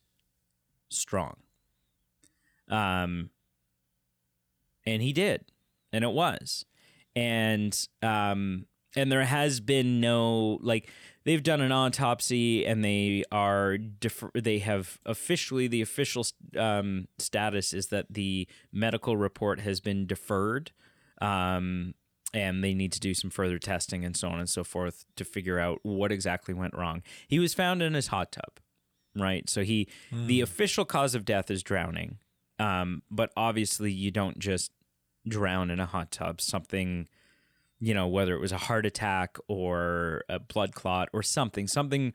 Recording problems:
none

